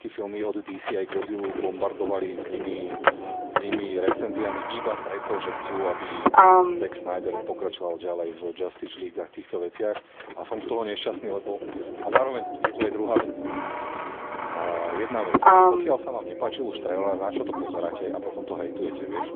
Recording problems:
phone-call audio; nothing above 3.5 kHz
traffic noise; very loud; throughout; 6 dB above the speech

